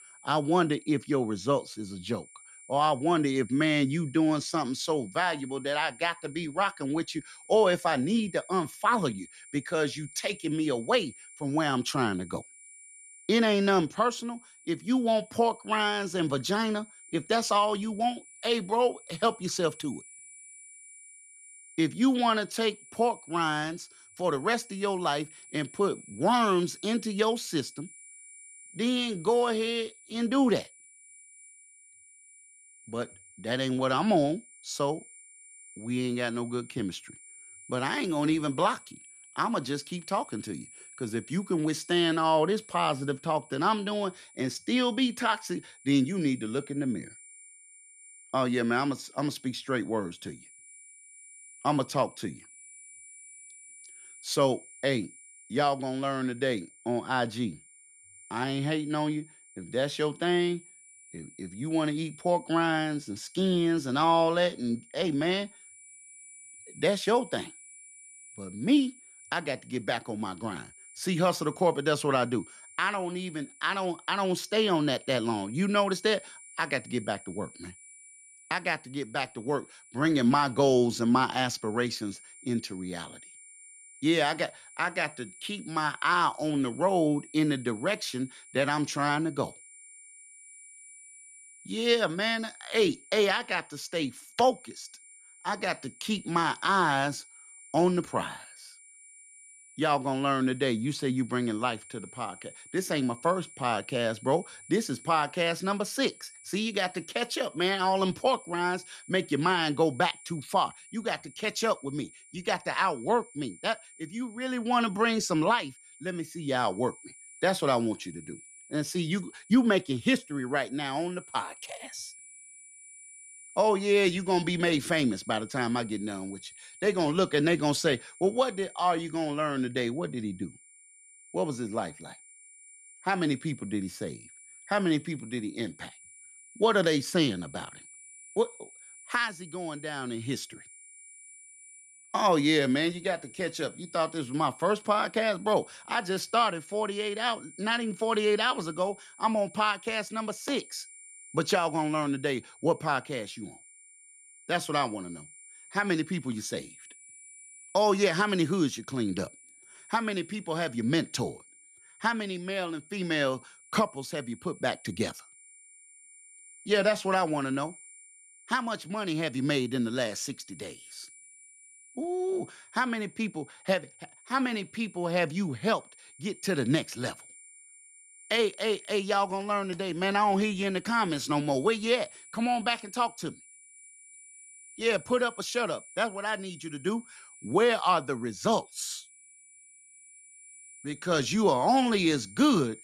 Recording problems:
high-pitched whine; faint; throughout; 9.5 kHz, 20 dB below the speech

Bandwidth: 14 kHz